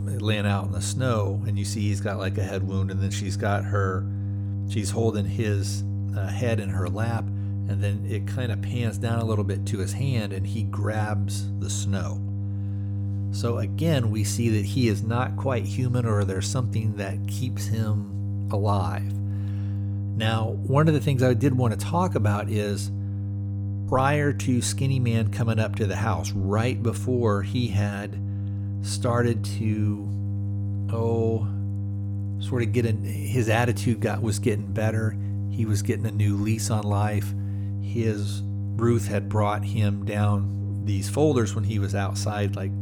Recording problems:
electrical hum; noticeable; throughout; 50 Hz, 10 dB below the speech

